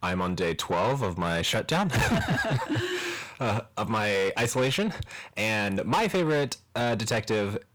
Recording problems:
distortion; heavy; 7 dB below the speech

